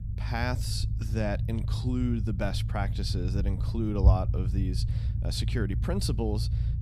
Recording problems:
low rumble; loud; throughout; 9 dB below the speech

